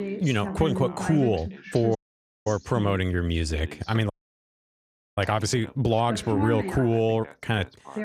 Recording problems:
background chatter; loud; throughout; 2 voices, 9 dB below the speech
audio cutting out; at 2 s for 0.5 s and at 4 s for 1 s

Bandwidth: 14.5 kHz